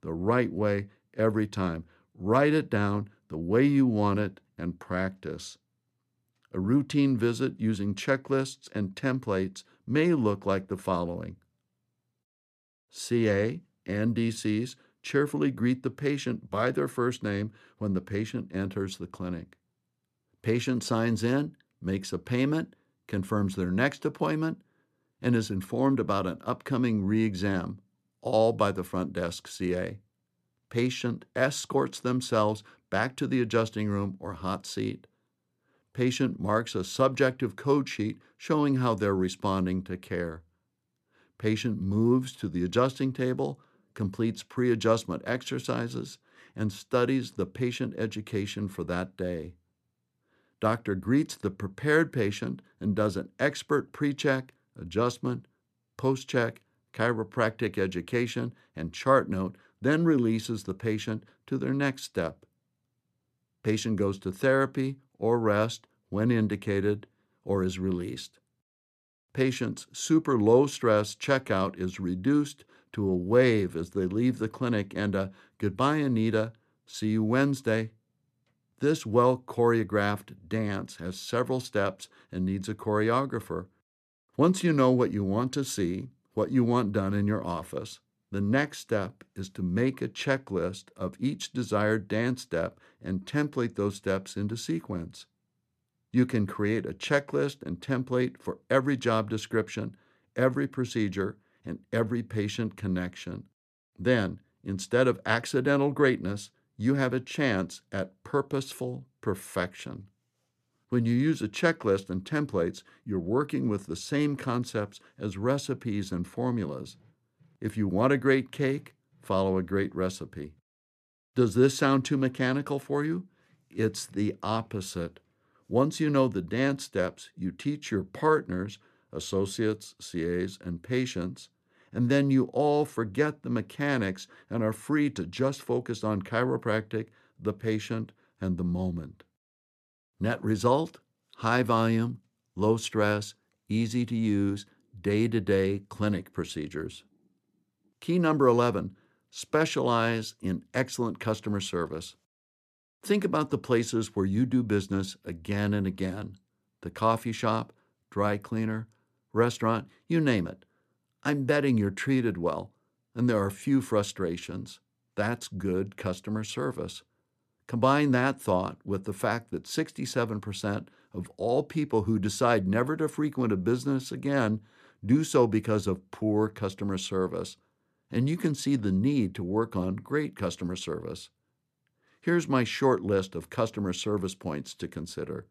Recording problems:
none

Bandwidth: 14 kHz